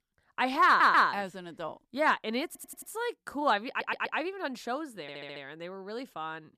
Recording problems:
audio stuttering; 4 times, first at 0.5 s

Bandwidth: 14.5 kHz